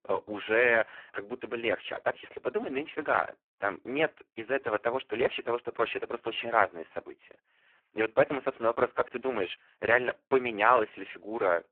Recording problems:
phone-call audio; poor line

